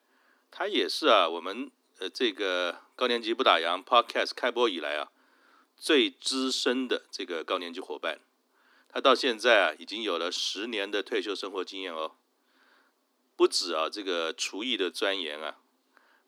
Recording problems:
thin; somewhat; fading below 250 Hz

